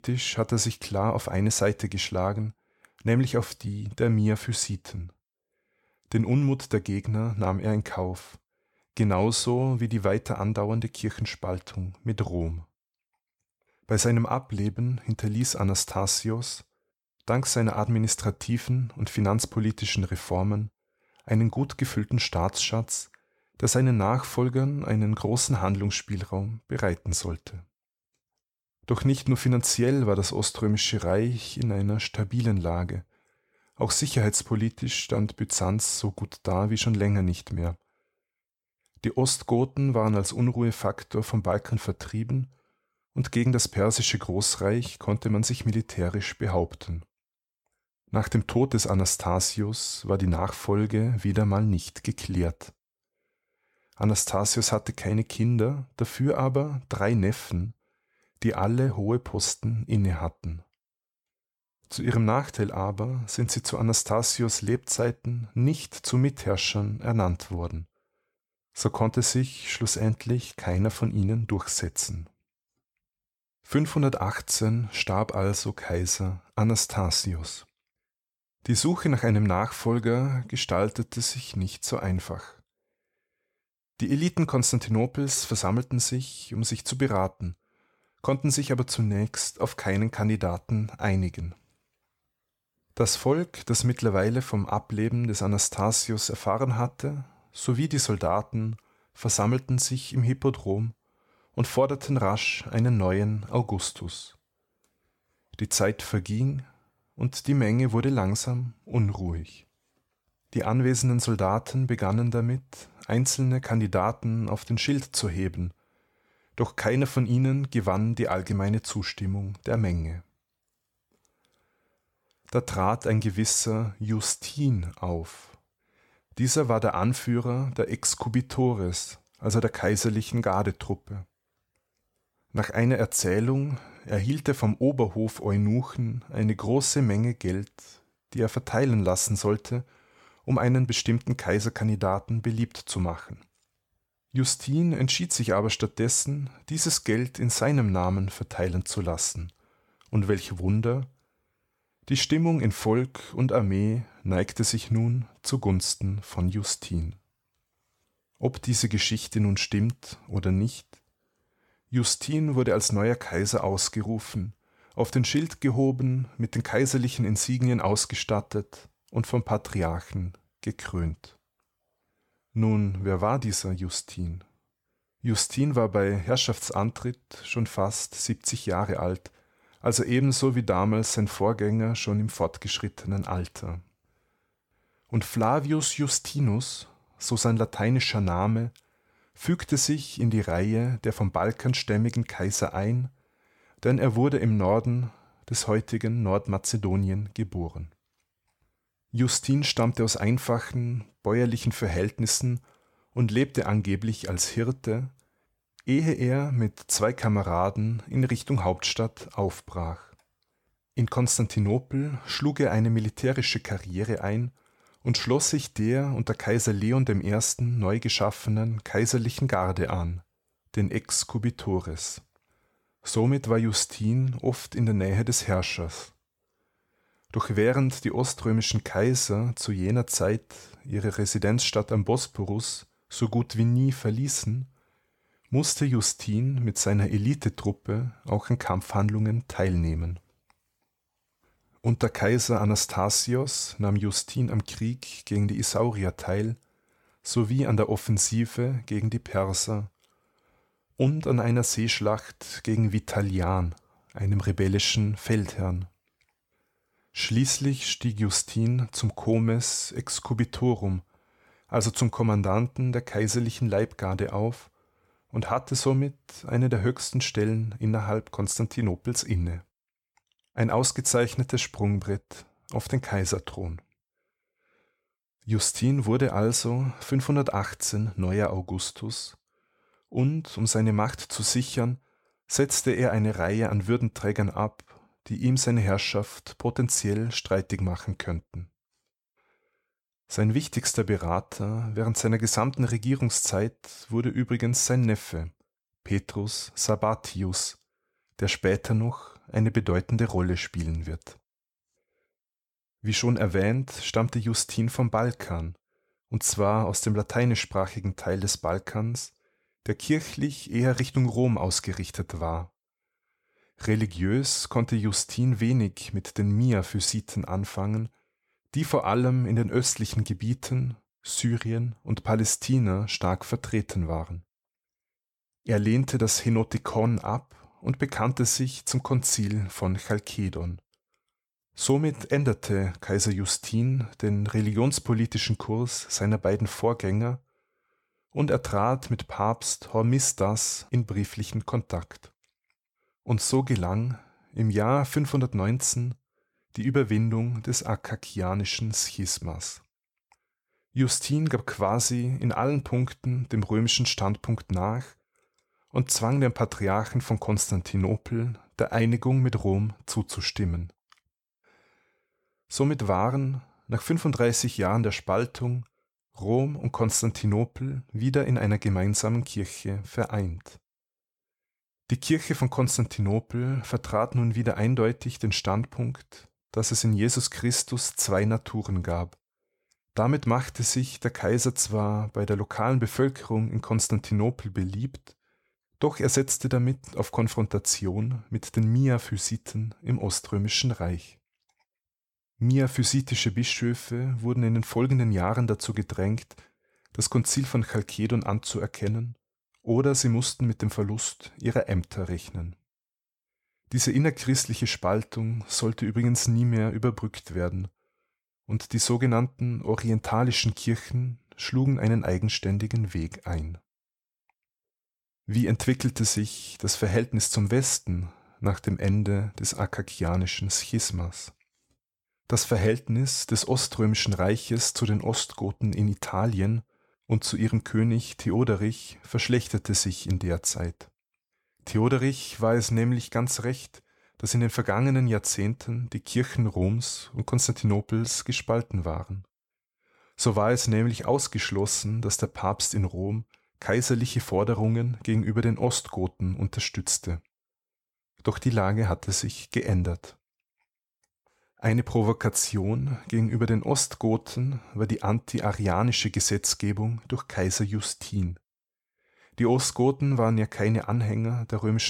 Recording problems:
abrupt cut into speech; at the end

